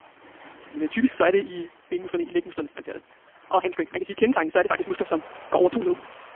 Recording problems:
phone-call audio; poor line; nothing above 3.5 kHz
wrong speed, natural pitch; too fast; 1.7 times normal speed
rain or running water; faint; throughout; 20 dB below the speech

